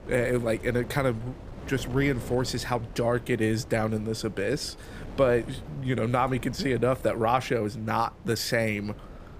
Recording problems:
wind noise on the microphone; occasional gusts; 20 dB below the speech

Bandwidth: 15 kHz